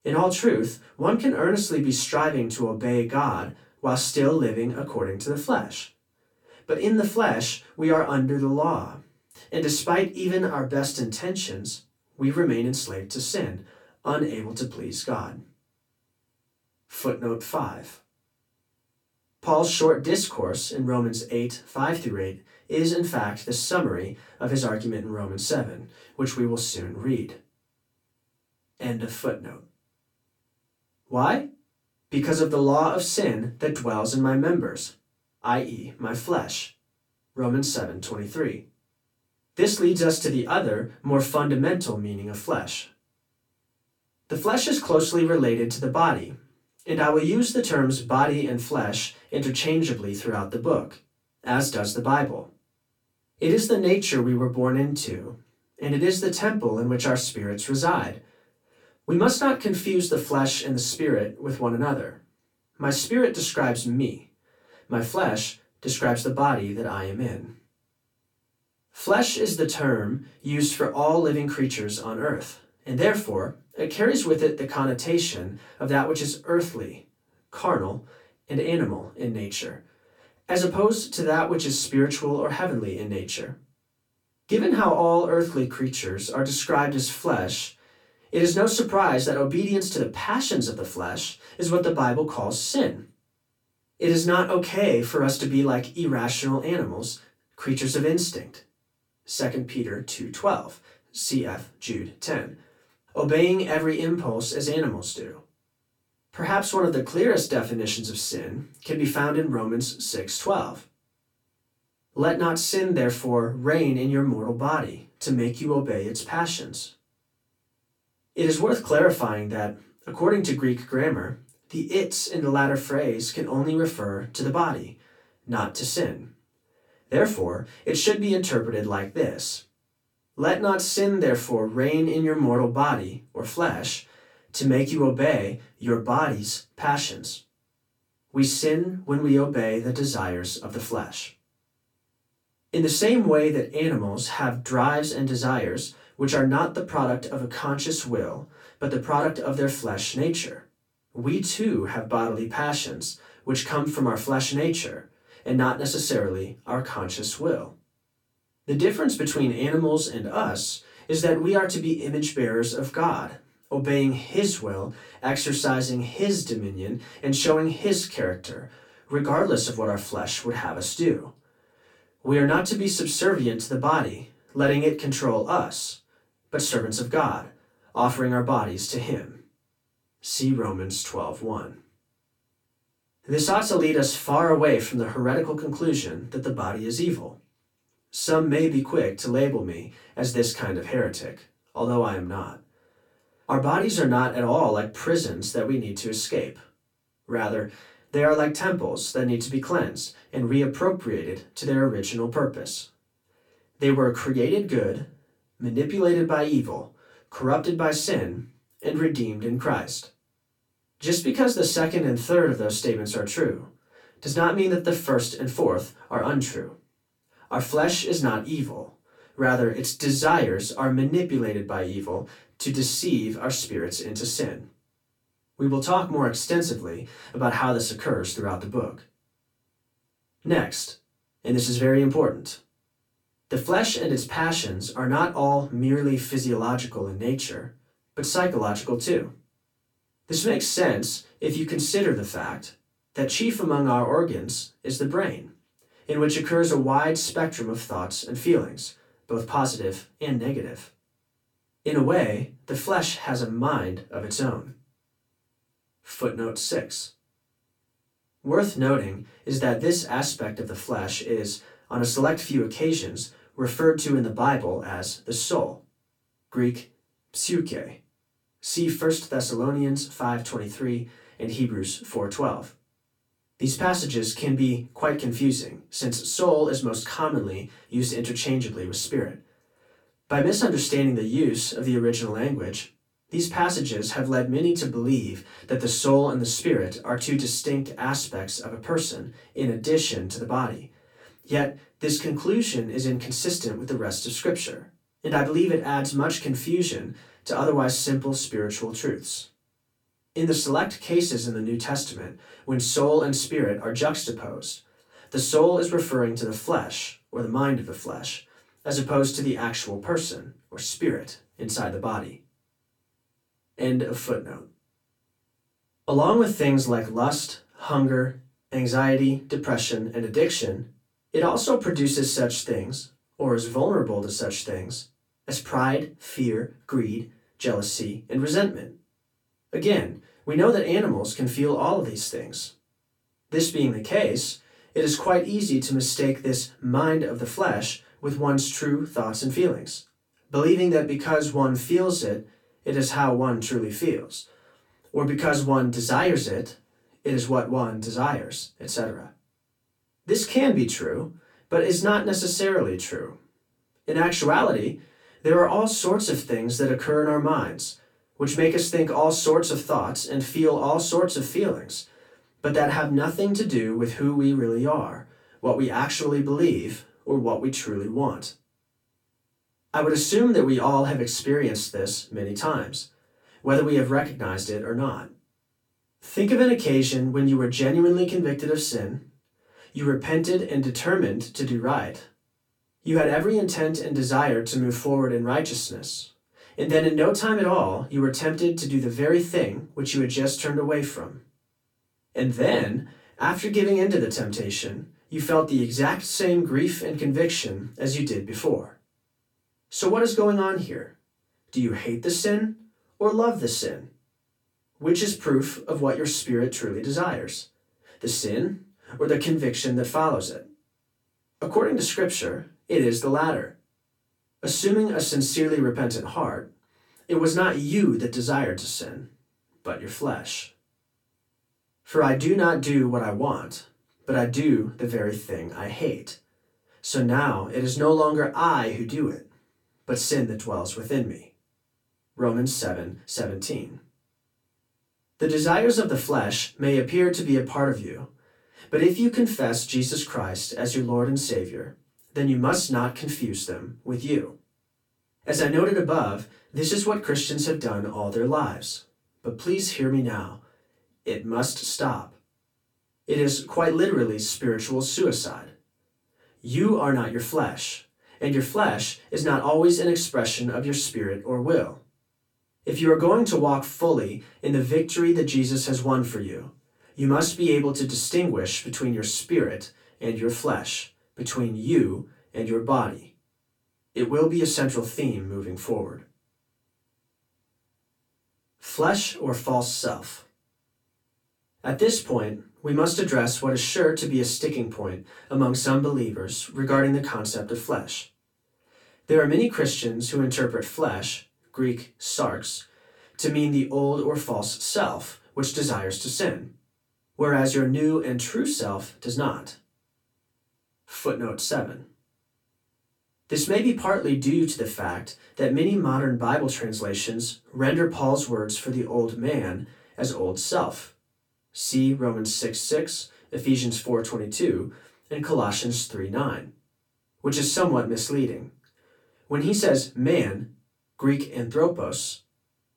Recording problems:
off-mic speech; far
room echo; very slight; dies away in 0.2 s

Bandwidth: 17.5 kHz